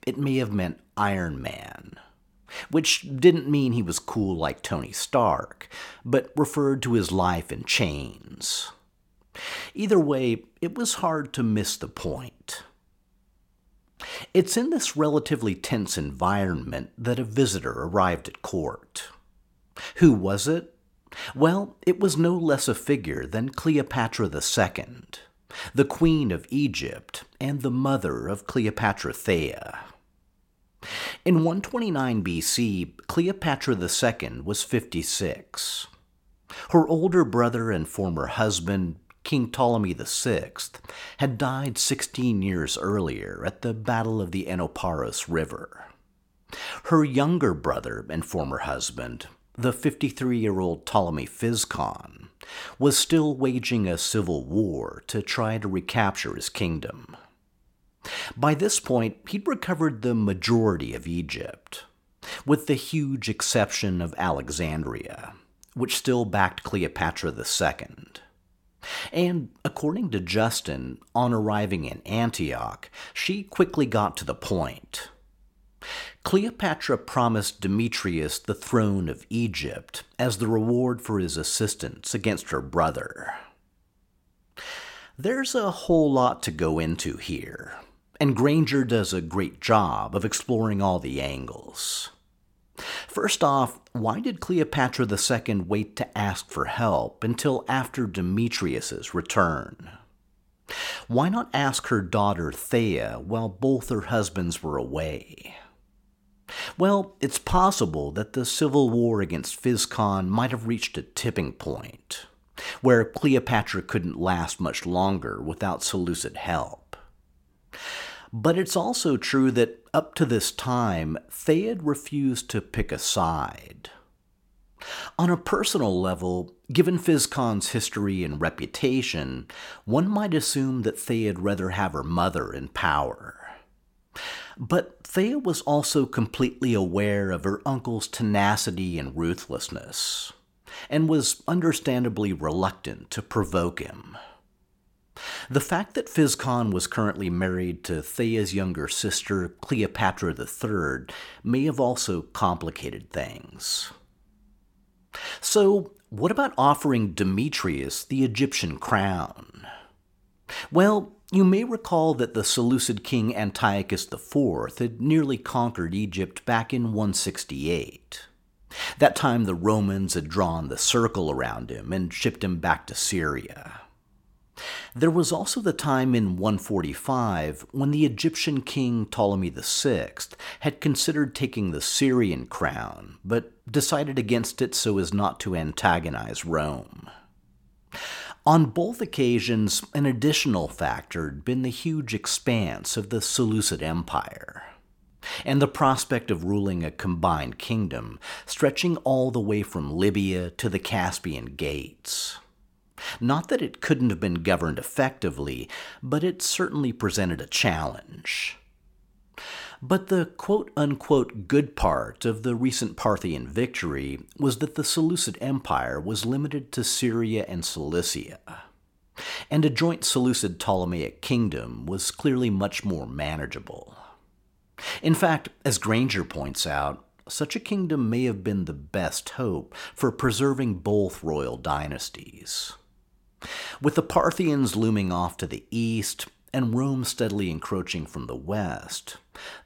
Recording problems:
none

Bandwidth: 17 kHz